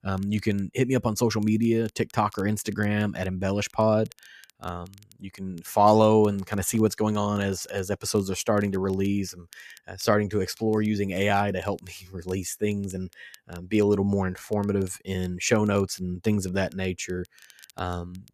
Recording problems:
crackle, like an old record; faint; 30 dB below the speech

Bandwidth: 14.5 kHz